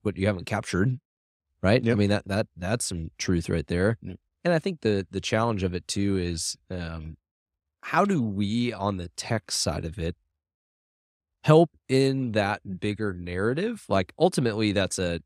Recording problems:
none

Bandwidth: 15.5 kHz